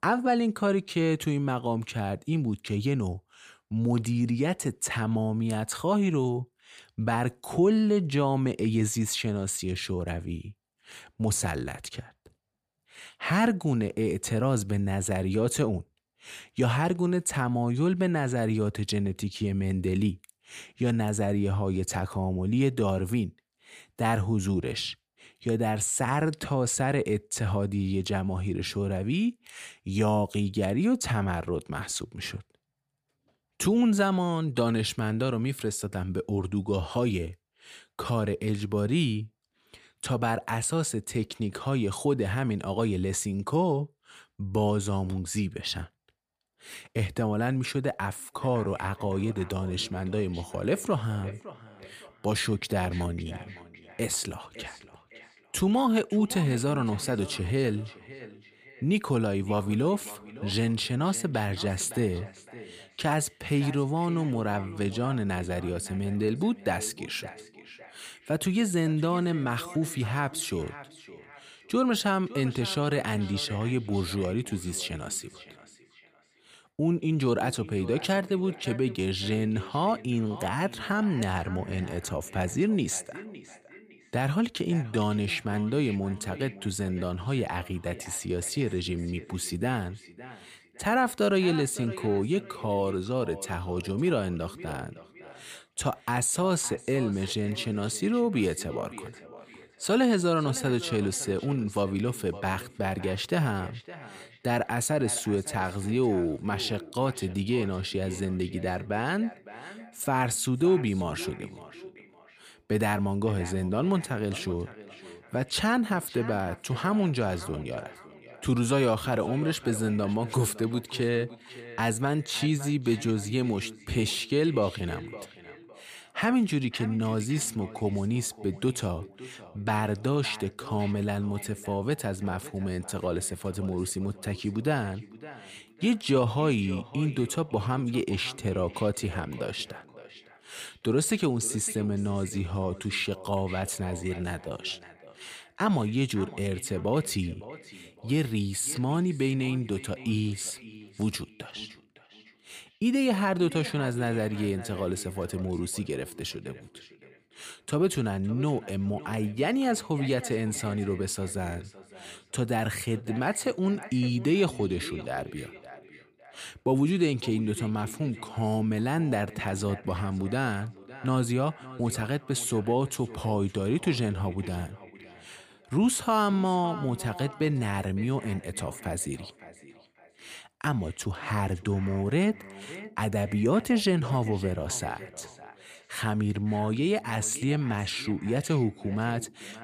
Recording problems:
echo of what is said; noticeable; from 48 s on; 560 ms later, 15 dB below the speech

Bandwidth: 15 kHz